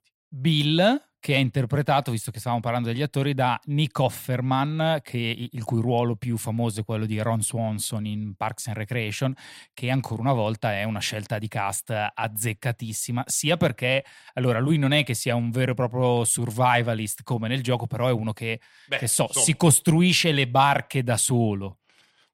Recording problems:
none

